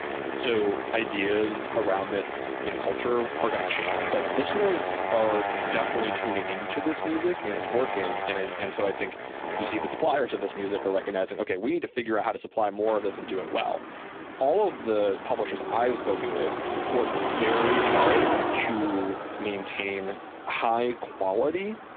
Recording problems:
phone-call audio; poor line
traffic noise; loud; throughout; 2 dB below the speech

